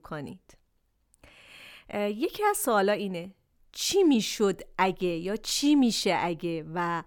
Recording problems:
none

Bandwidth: 19 kHz